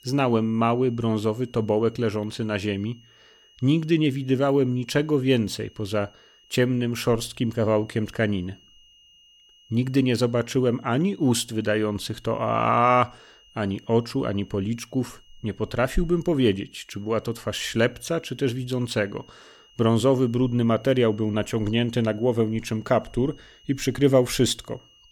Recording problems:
high-pitched whine; faint; throughout; 3 kHz, 30 dB below the speech

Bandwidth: 18 kHz